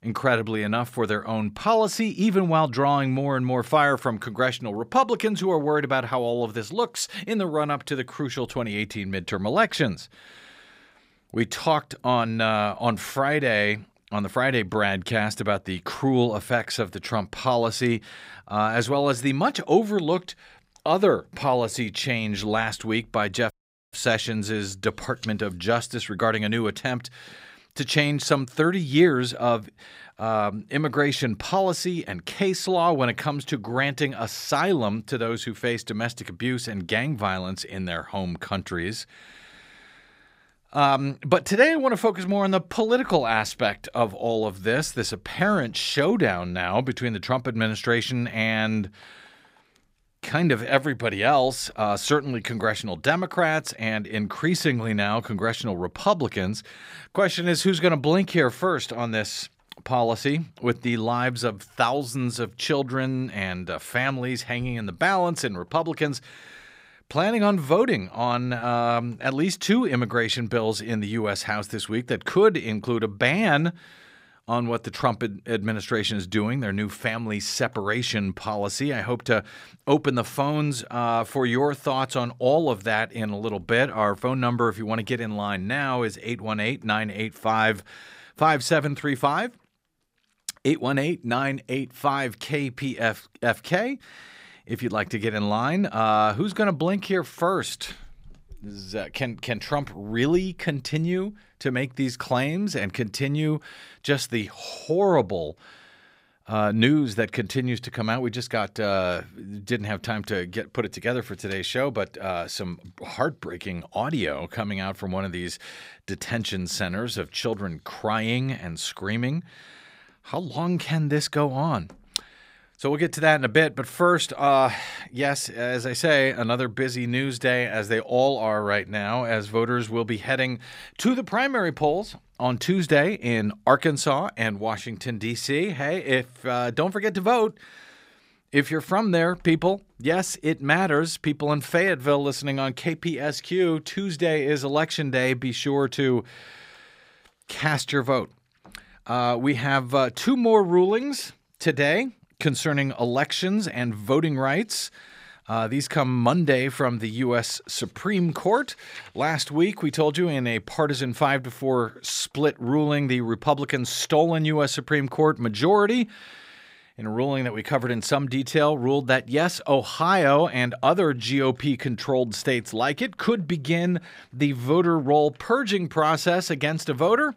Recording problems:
audio cutting out; at 24 s

